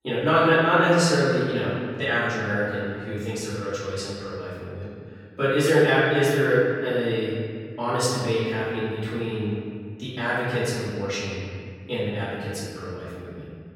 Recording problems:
room echo; strong; dies away in 2.1 s
off-mic speech; far

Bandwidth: 17 kHz